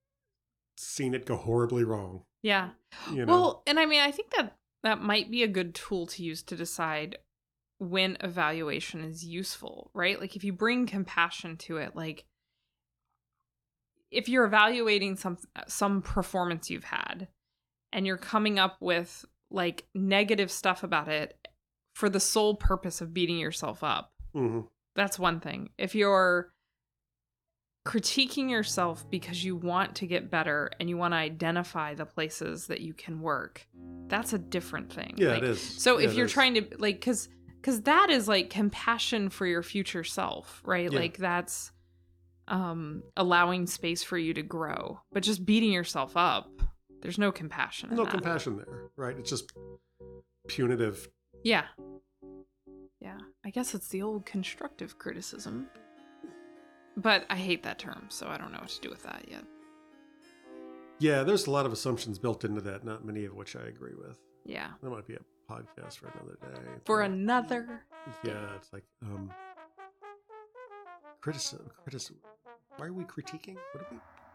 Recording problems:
background music; faint; from 29 s on; 25 dB below the speech

